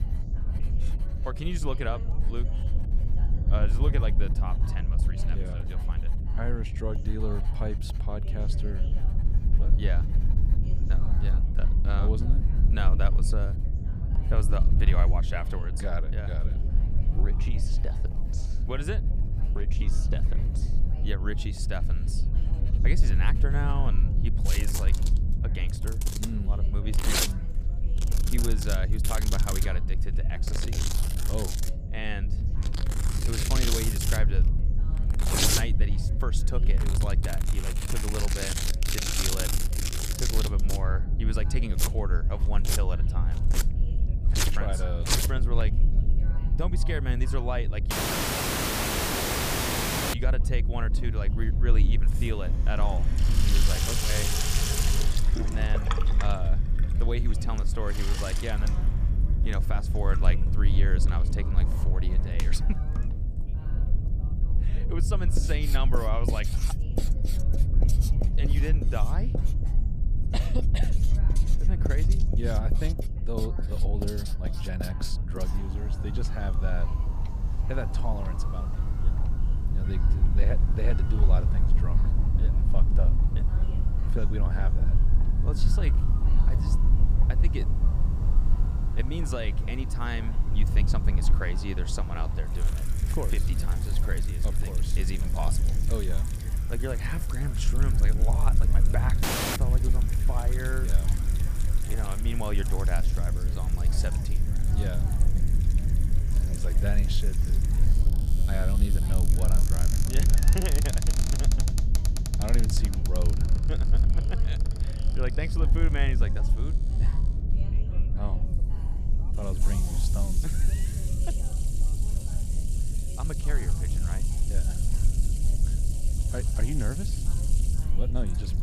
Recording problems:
household noises; very loud; throughout; as loud as the speech
low rumble; loud; throughout; 7 dB below the speech
background chatter; noticeable; throughout; 2 voices, 20 dB below the speech
electrical hum; faint; throughout; 60 Hz, 20 dB below the speech
audio cutting out; at 48 s for 2 s and at 1:39

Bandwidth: 15 kHz